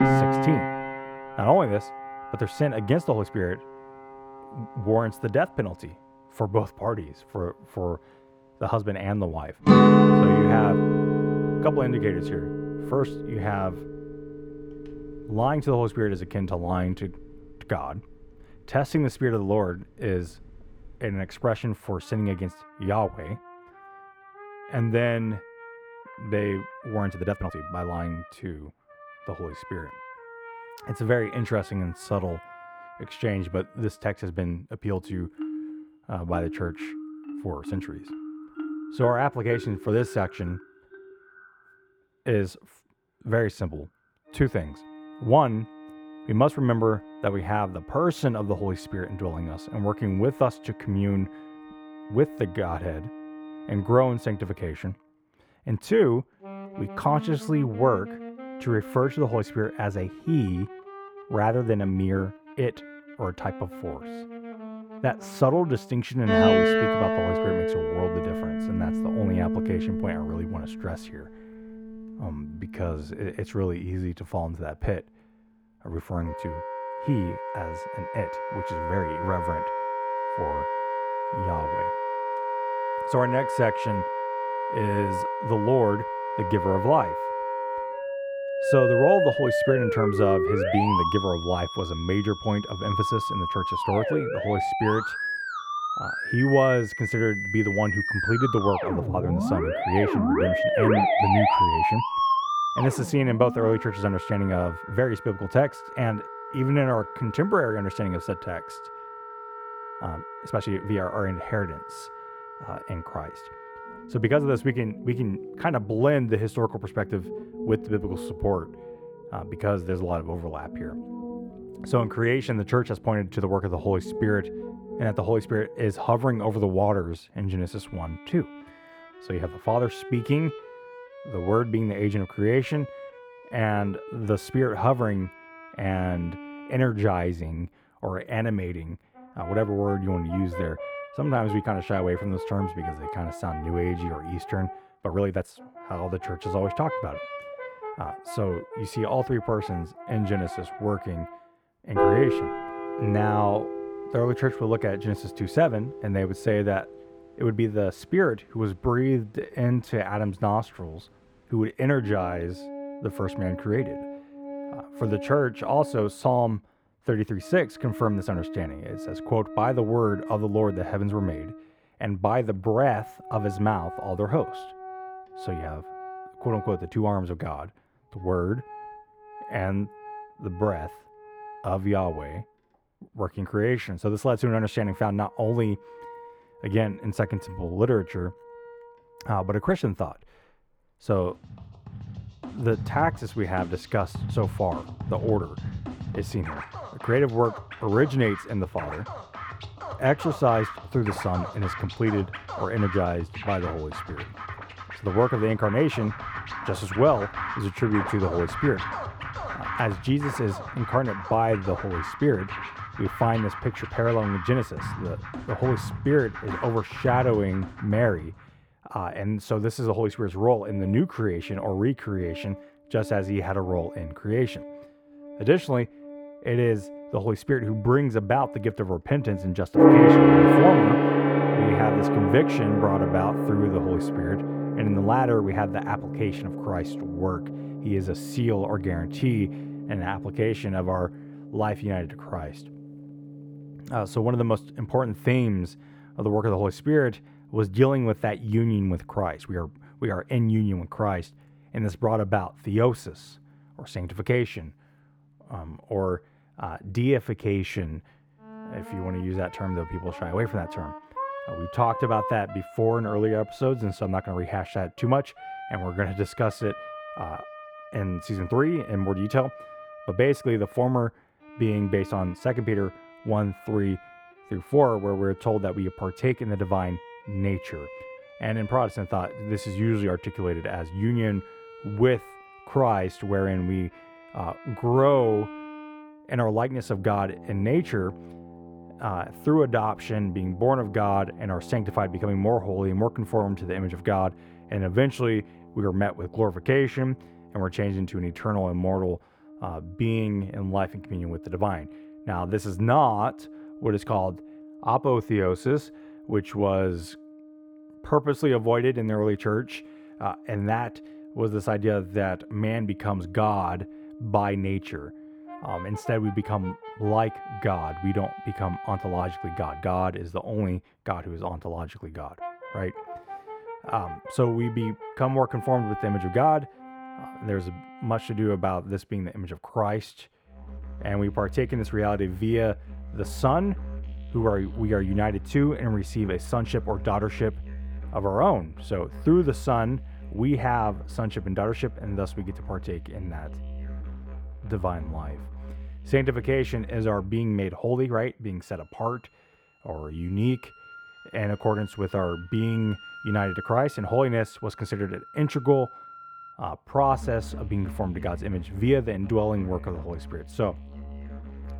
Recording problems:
muffled; slightly; fading above 3.5 kHz
background music; loud; throughout; 3 dB below the speech
uneven, jittery; strongly; from 27 s to 5:16

